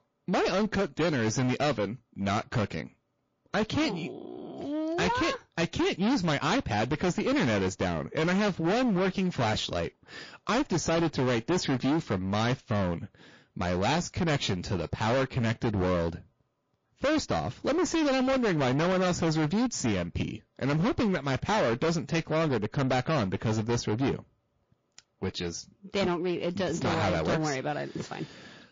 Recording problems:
distortion; heavy; 23% of the sound clipped
garbled, watery; slightly

